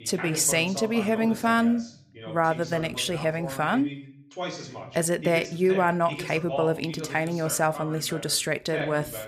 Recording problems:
voice in the background; noticeable; throughout; 10 dB below the speech

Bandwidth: 15 kHz